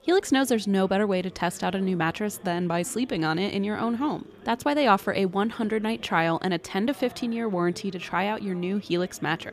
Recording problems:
chatter from many people; faint; throughout; 20 dB below the speech

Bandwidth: 15 kHz